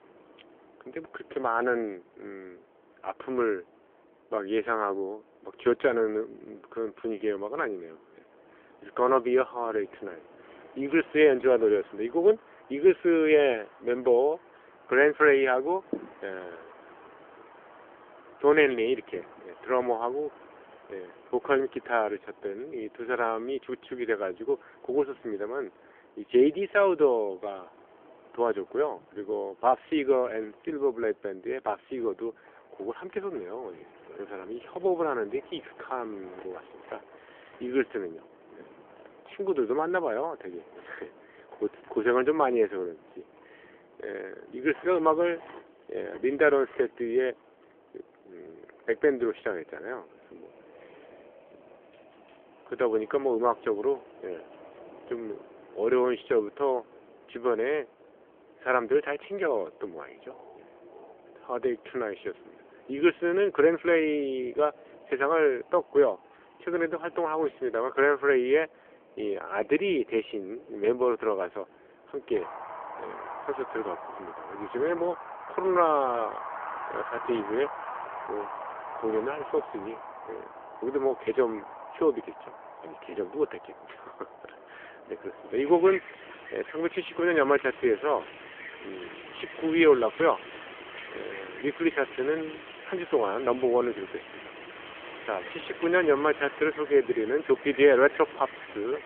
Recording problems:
phone-call audio; nothing above 3.5 kHz
wind in the background; noticeable; throughout; 15 dB below the speech

